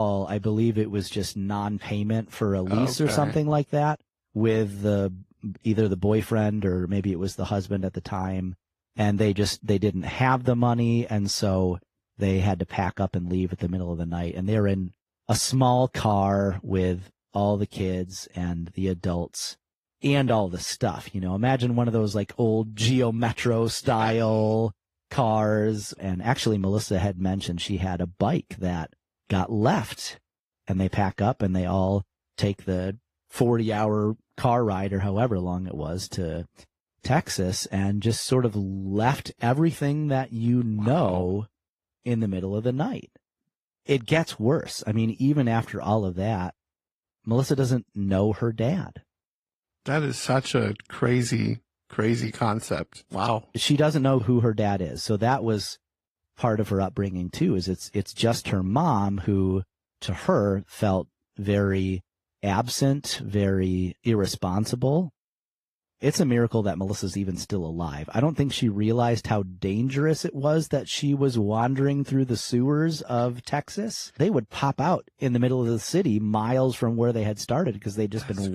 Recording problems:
garbled, watery; slightly
abrupt cut into speech; at the start and the end

